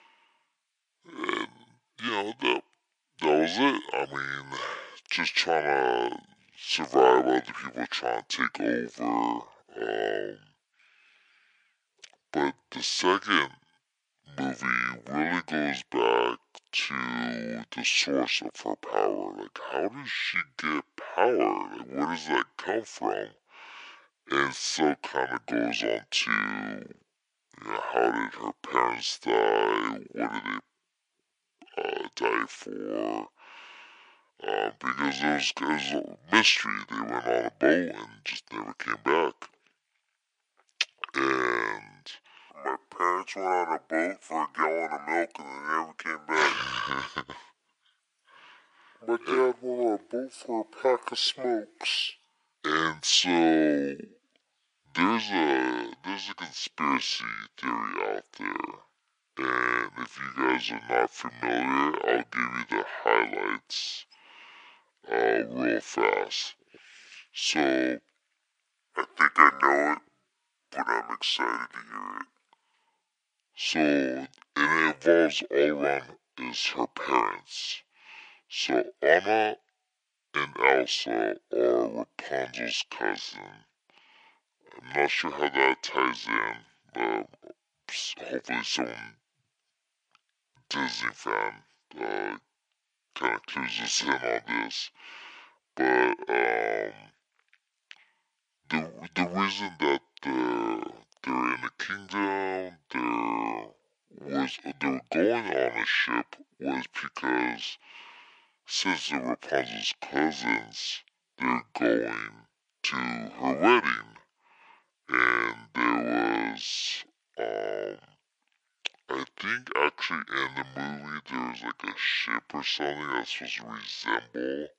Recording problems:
thin; very; fading below 350 Hz
wrong speed and pitch; too slow and too low; 0.6 times normal speed

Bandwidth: 10.5 kHz